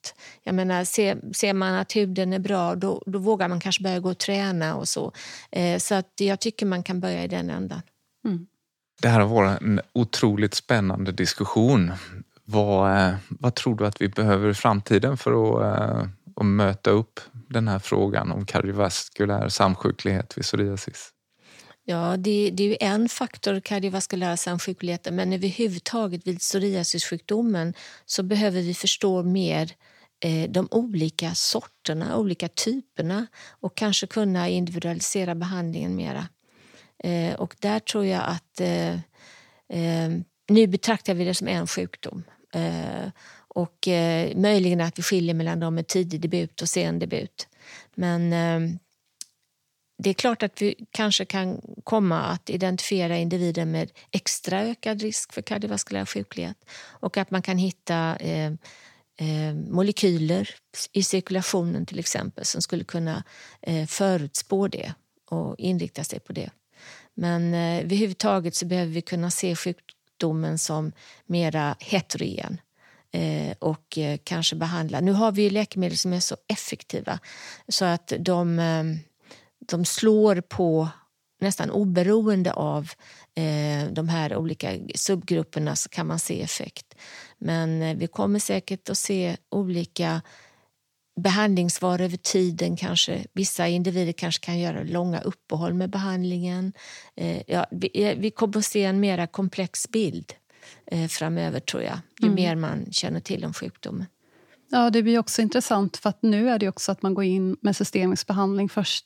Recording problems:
none

